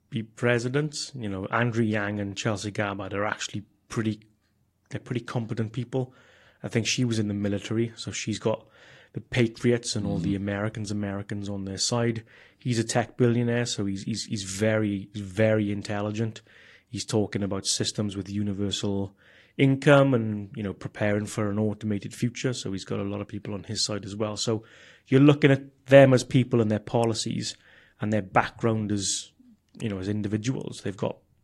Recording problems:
garbled, watery; slightly; nothing above 15.5 kHz

